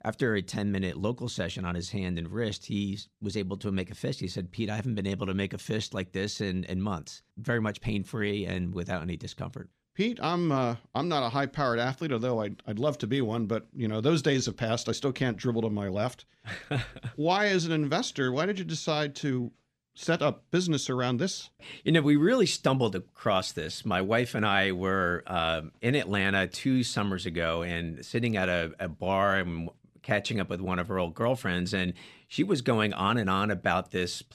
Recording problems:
none

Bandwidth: 14.5 kHz